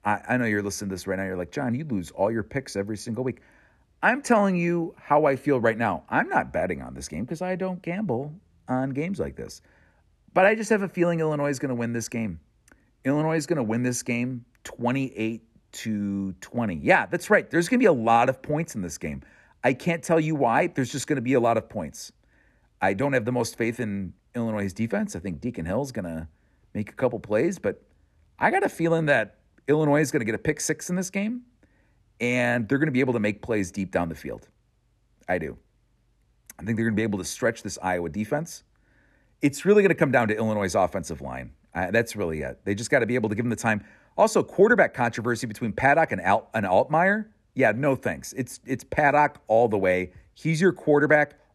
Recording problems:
none

